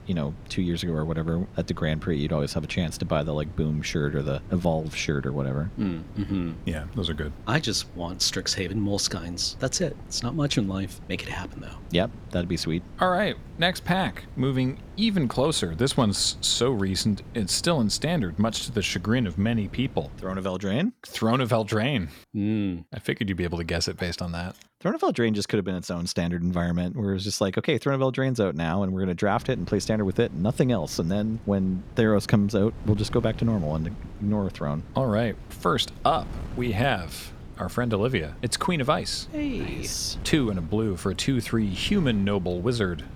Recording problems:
wind noise on the microphone; occasional gusts; until 20 s and from 29 s on; 20 dB below the speech

